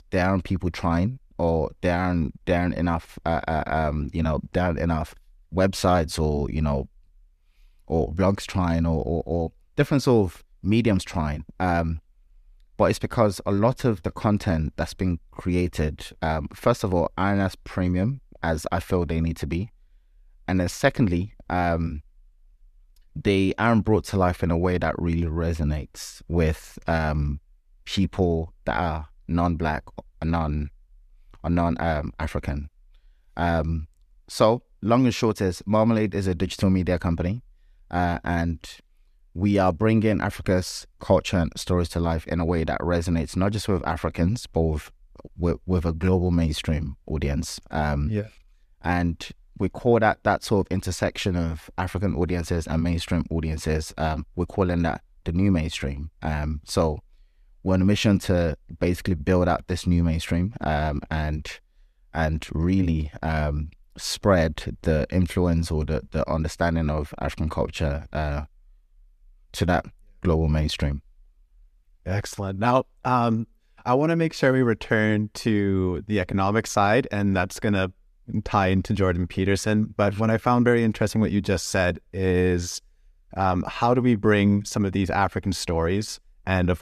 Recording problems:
none

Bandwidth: 14.5 kHz